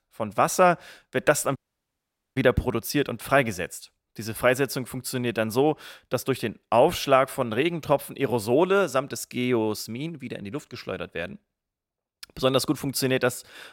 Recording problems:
audio cutting out; at 1.5 s for 1 s

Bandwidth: 16.5 kHz